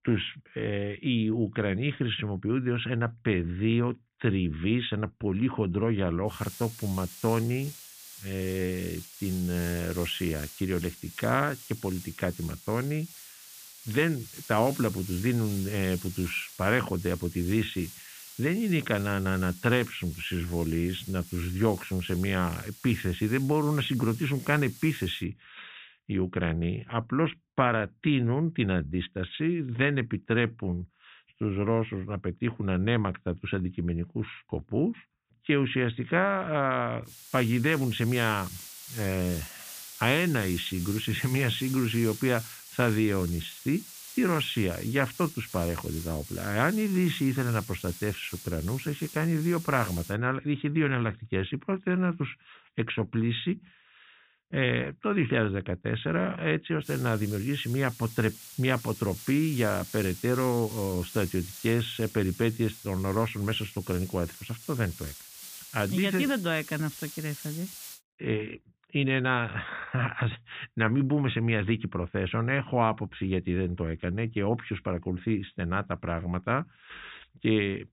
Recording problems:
high frequencies cut off; severe; nothing above 4 kHz
hiss; noticeable; from 6.5 to 25 s, from 37 to 50 s and from 57 s to 1:08; 15 dB below the speech

